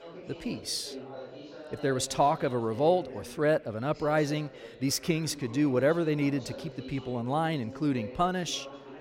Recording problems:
background chatter; noticeable; throughout; 3 voices, 15 dB below the speech

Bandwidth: 16 kHz